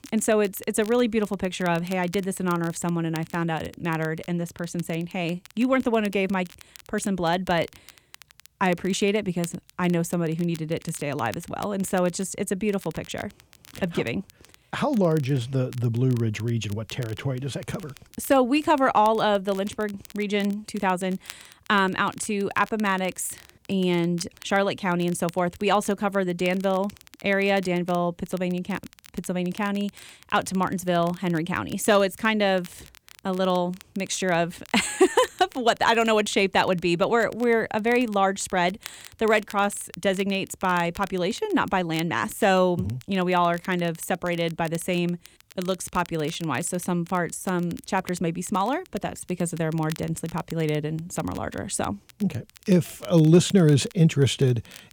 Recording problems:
crackle, like an old record; faint; 25 dB below the speech

